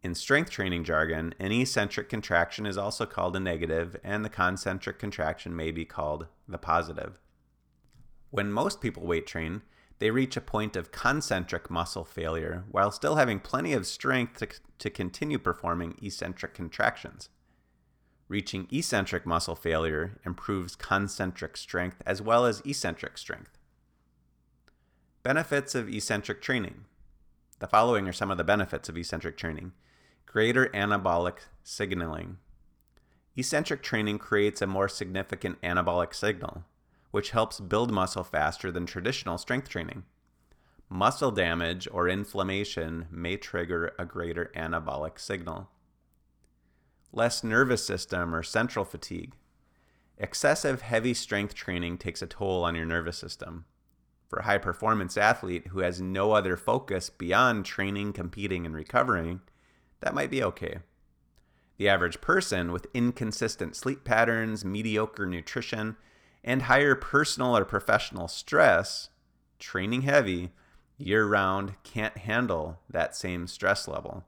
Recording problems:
none

